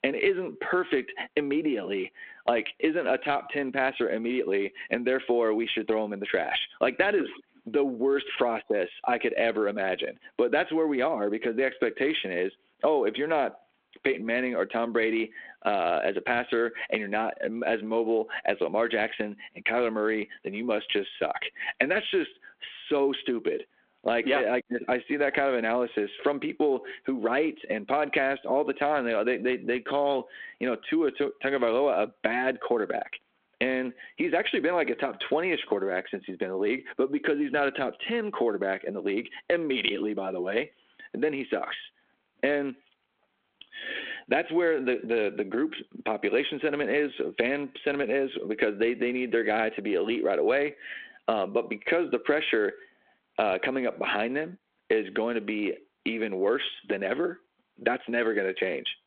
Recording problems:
squashed, flat; heavily
phone-call audio

